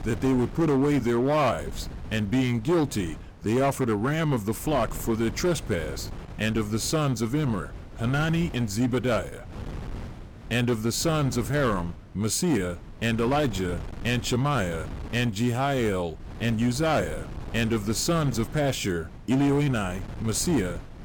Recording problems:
distortion; slight; 8% of the sound clipped
wind noise on the microphone; occasional gusts; 20 dB below the speech

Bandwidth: 17 kHz